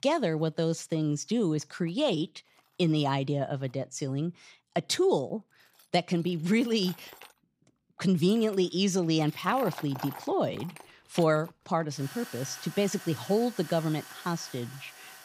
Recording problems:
machinery noise; noticeable; throughout; 15 dB below the speech

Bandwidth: 15 kHz